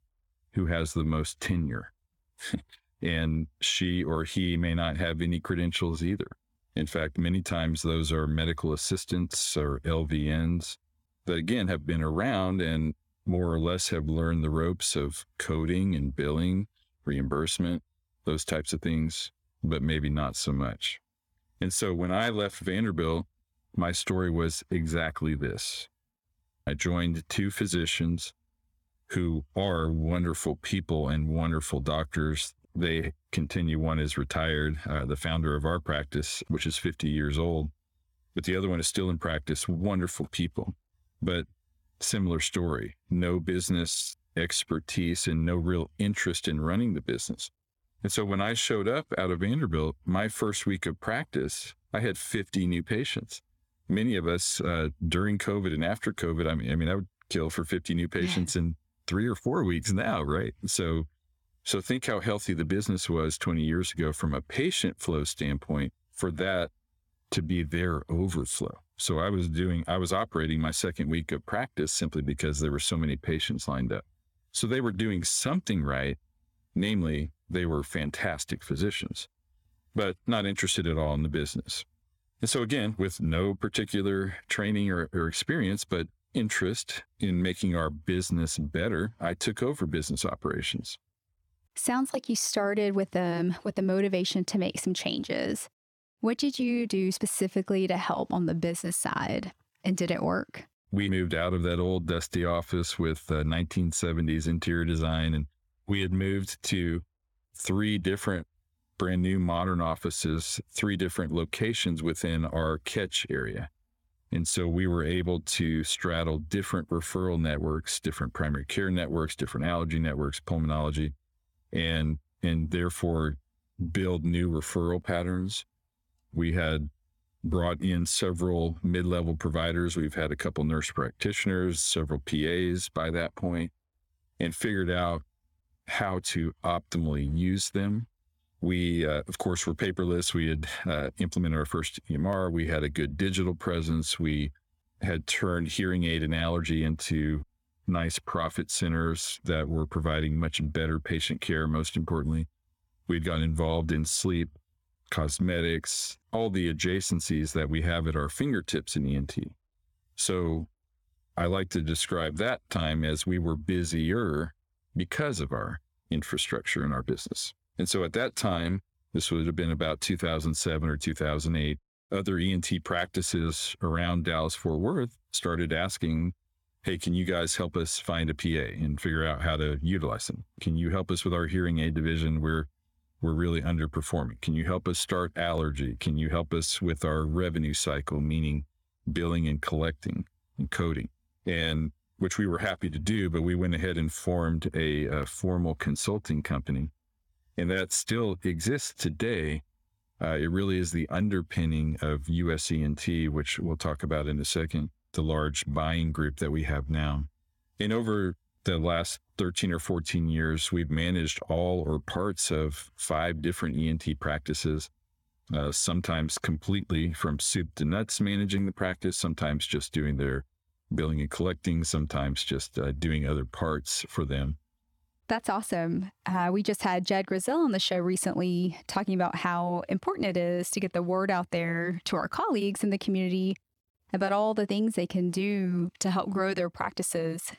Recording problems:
squashed, flat; somewhat

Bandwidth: 18.5 kHz